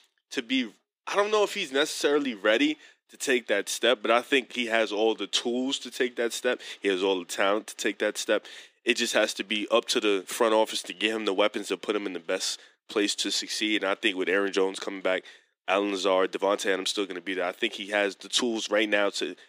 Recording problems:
thin; somewhat; fading below 300 Hz

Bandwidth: 15 kHz